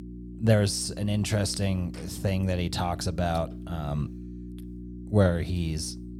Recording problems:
electrical hum; noticeable; throughout; 60 Hz, 15 dB below the speech

